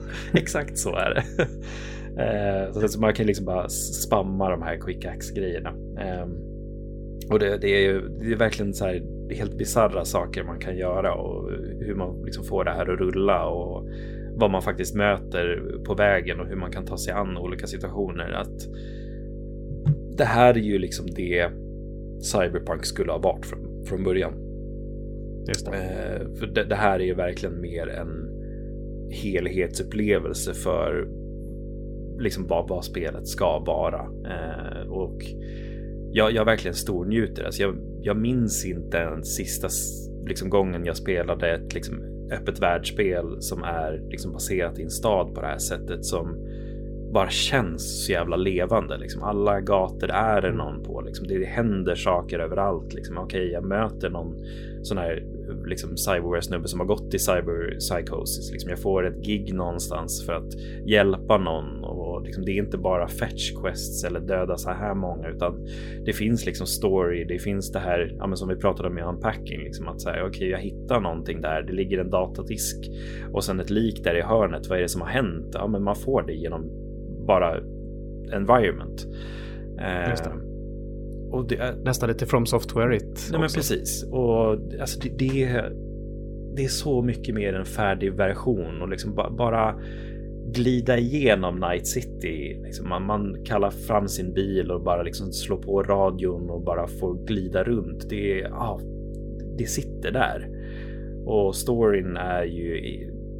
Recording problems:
electrical hum; noticeable; throughout; 50 Hz, 15 dB below the speech

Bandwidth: 16.5 kHz